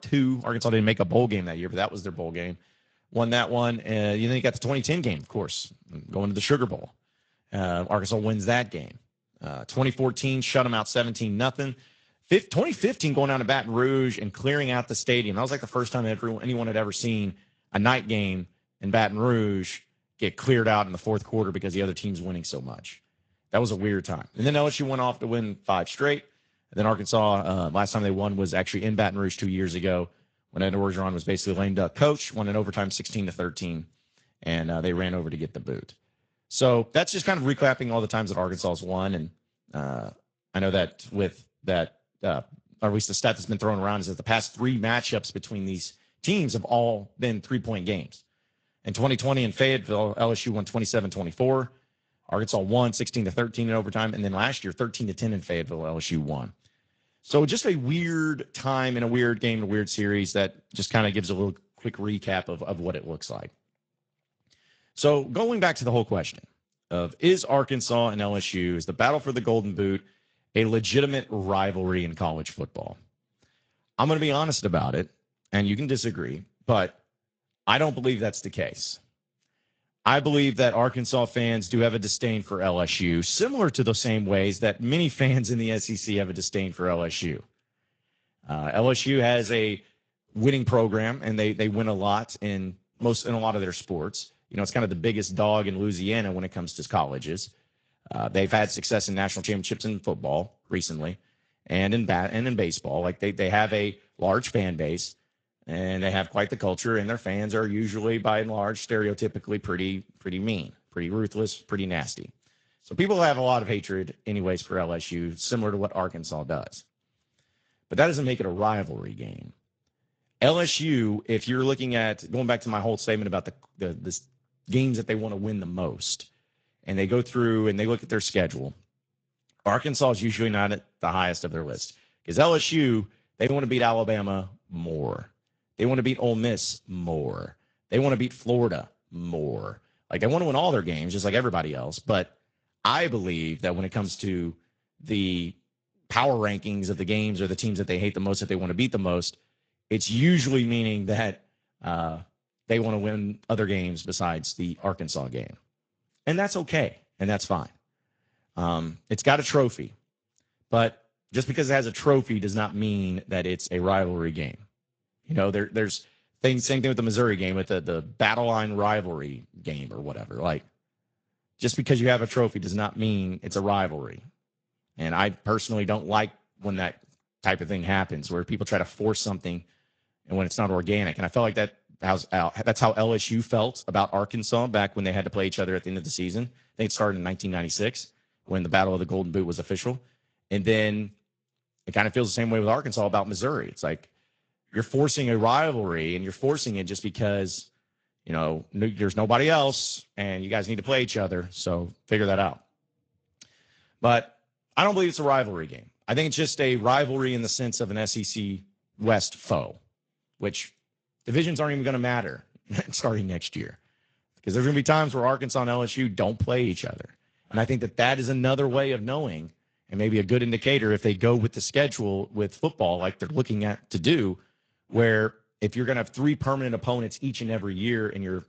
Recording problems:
garbled, watery; slightly; nothing above 7.5 kHz

